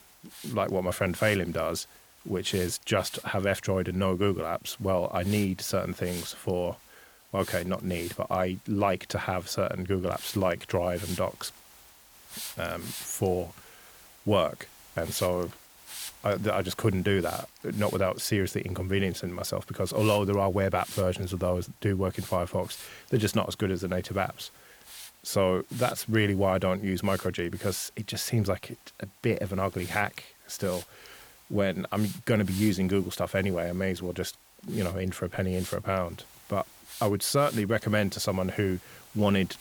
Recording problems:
hiss; noticeable; throughout; 15 dB below the speech

